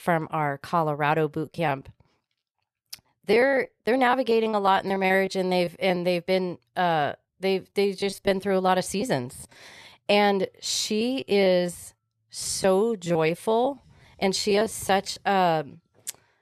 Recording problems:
choppy; very; from 1.5 to 6 s, from 8 to 9.5 s and from 11 to 15 s; 12% of the speech affected

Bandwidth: 13.5 kHz